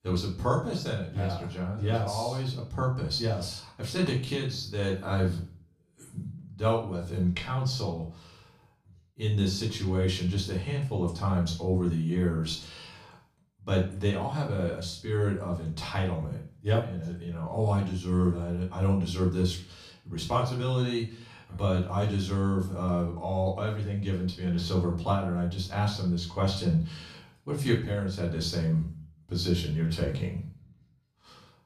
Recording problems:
off-mic speech; far
room echo; slight; dies away in 0.4 s

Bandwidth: 15 kHz